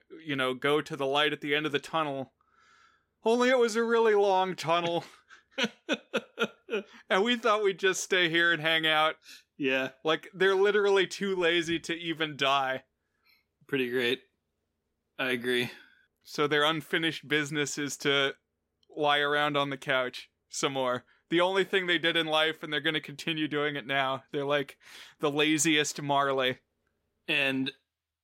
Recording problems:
none

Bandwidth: 16 kHz